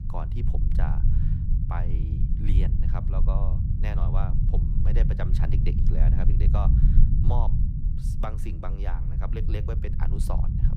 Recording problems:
low rumble; loud; throughout; 2 dB below the speech

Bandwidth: 15.5 kHz